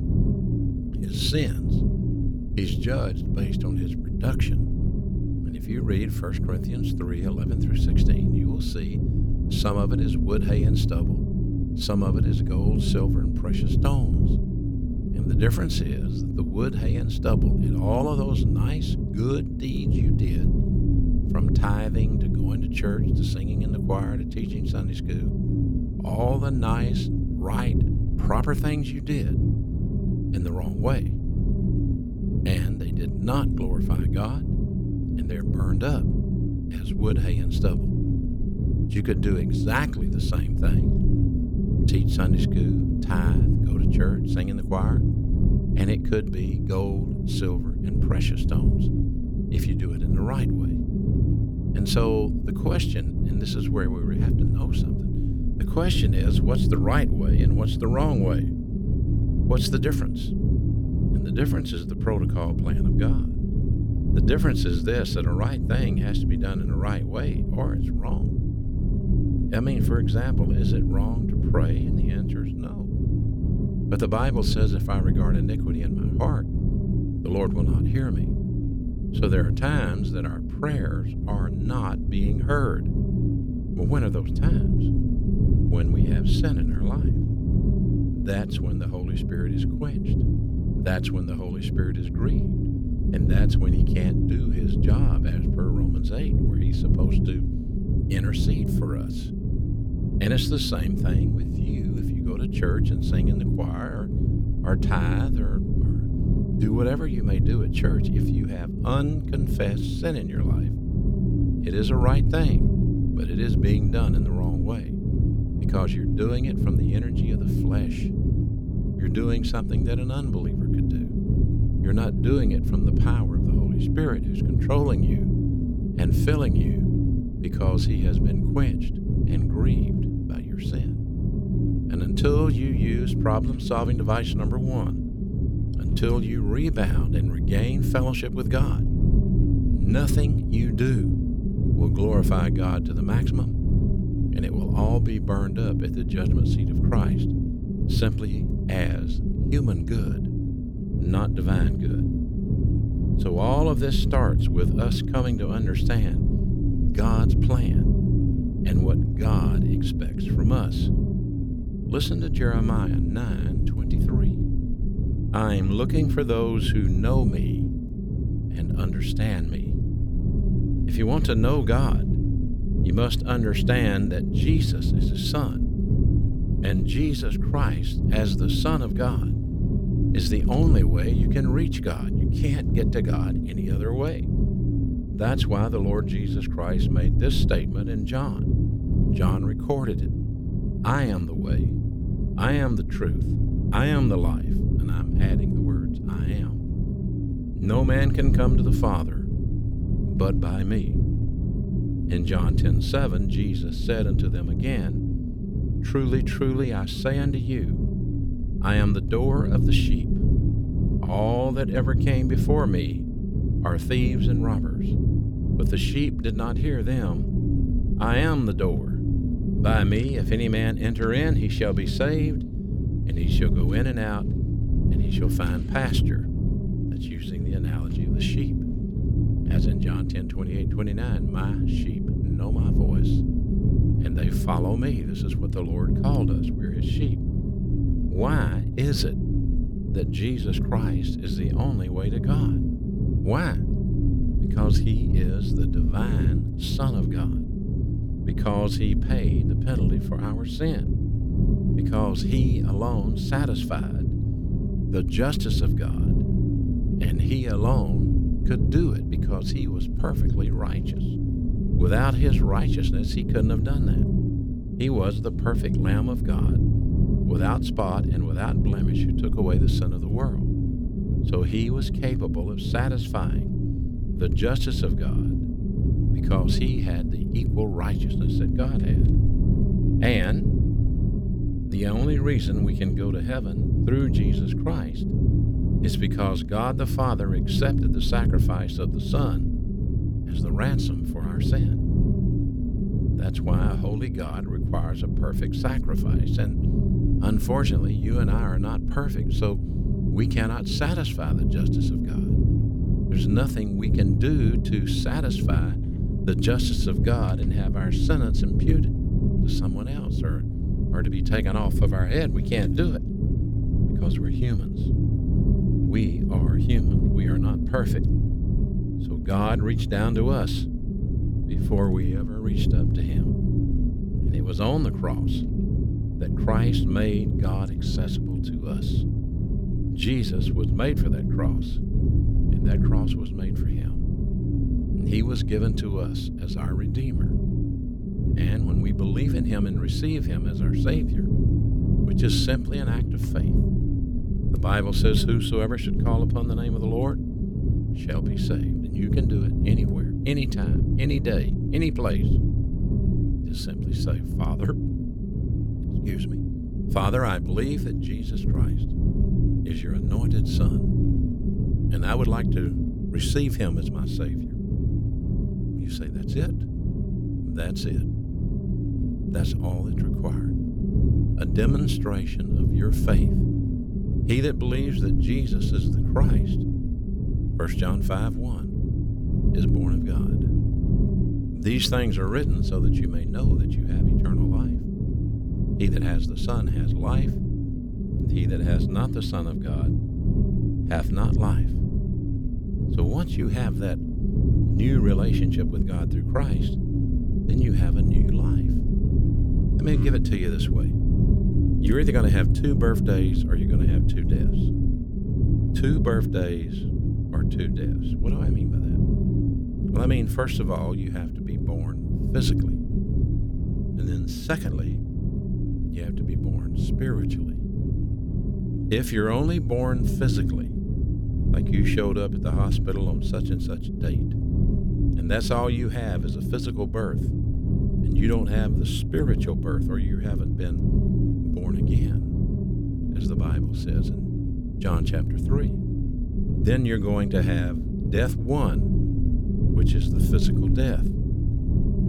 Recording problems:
low rumble; loud; throughout; 3 dB below the speech

